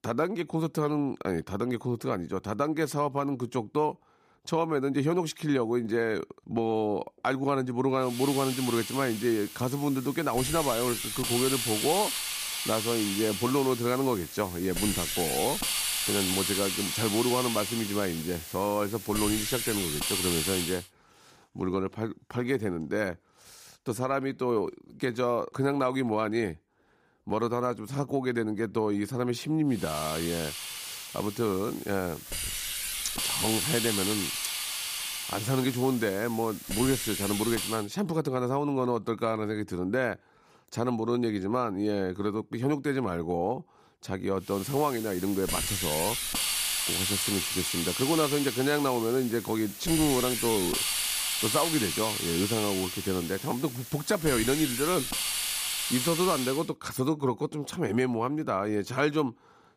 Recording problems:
hiss; loud; from 8 to 21 s, from 30 to 38 s and from 45 to 57 s; 1 dB below the speech

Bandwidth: 15 kHz